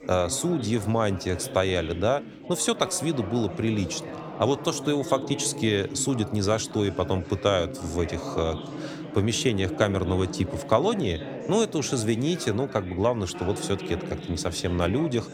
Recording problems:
background chatter; noticeable; throughout; 4 voices, 10 dB below the speech

